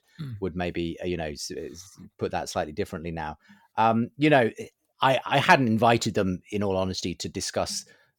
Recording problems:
none

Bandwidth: 18 kHz